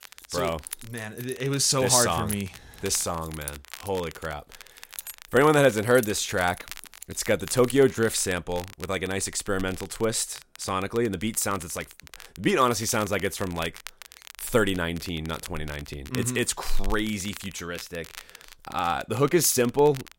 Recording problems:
crackle, like an old record; noticeable; 20 dB below the speech
jangling keys; noticeable; until 7.5 s; peak 8 dB below the speech

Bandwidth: 16 kHz